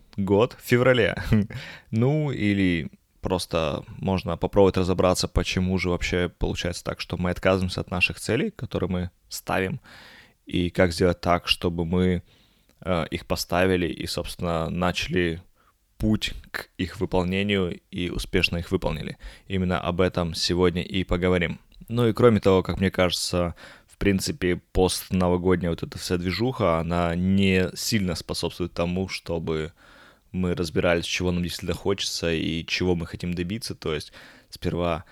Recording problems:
none

